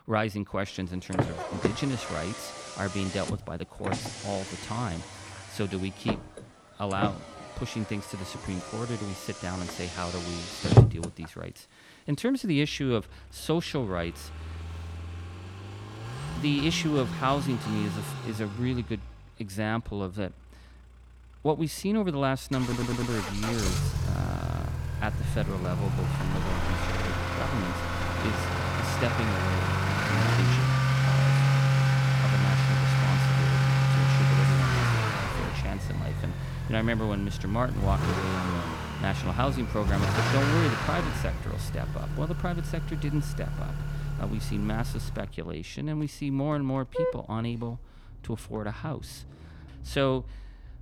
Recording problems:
traffic noise; very loud; throughout; 4 dB above the speech
audio stuttering; at 23 s and at 27 s

